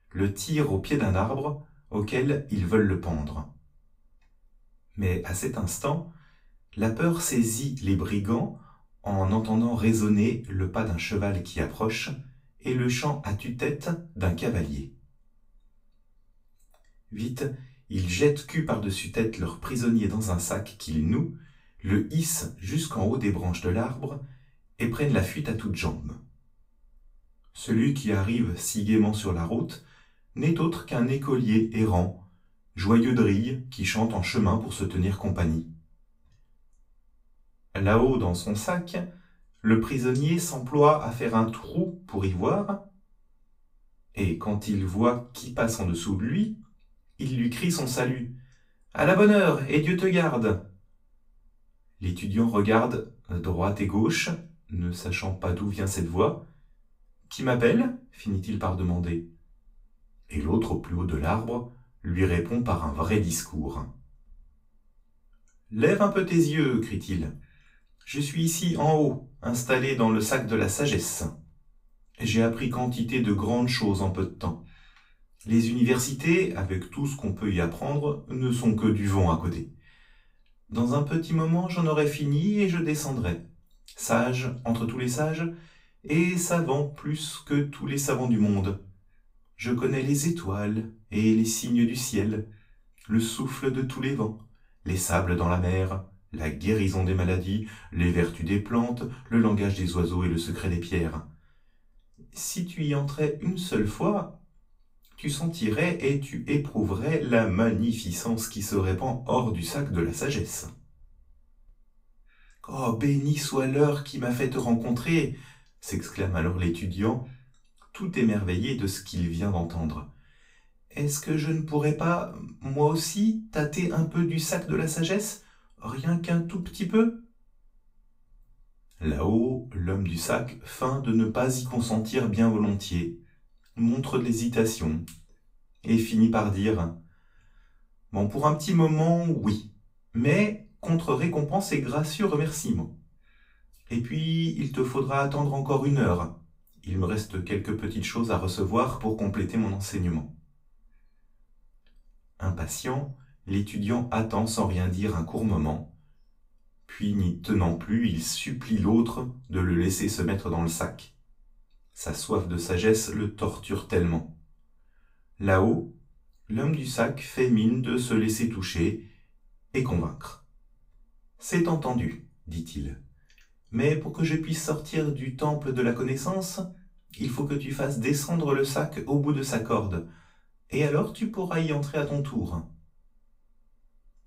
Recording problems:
off-mic speech; far
room echo; very slight; dies away in 0.2 s

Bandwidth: 15.5 kHz